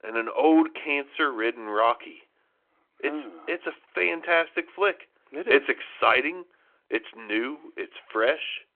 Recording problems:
phone-call audio

